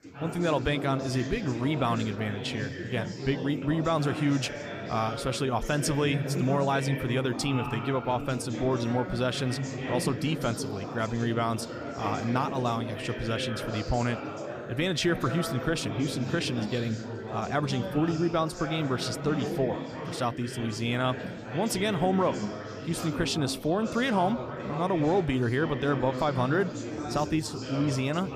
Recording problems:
chatter from many people; loud; throughout; 6 dB below the speech

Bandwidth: 15 kHz